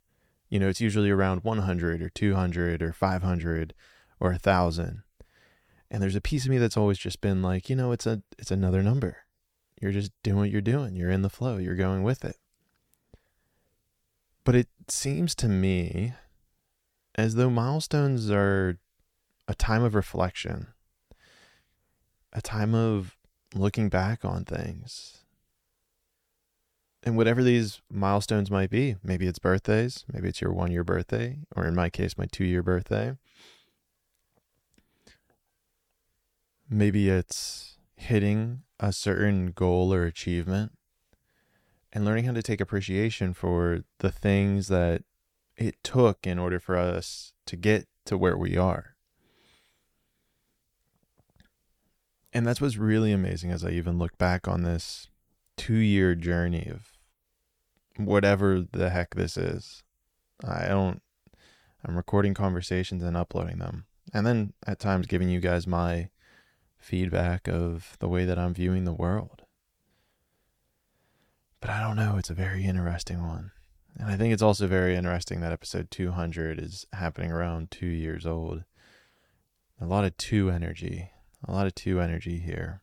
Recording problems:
none

